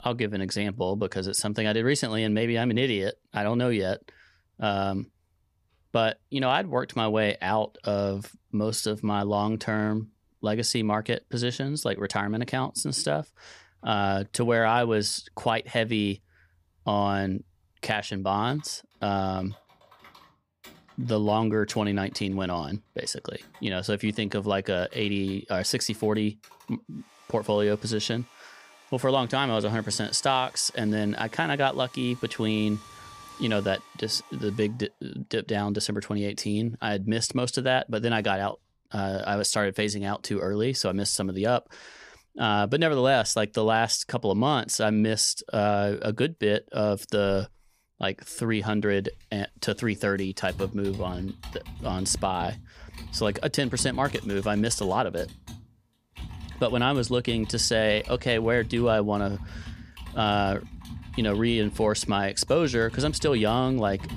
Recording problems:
household noises; noticeable; throughout; 20 dB below the speech

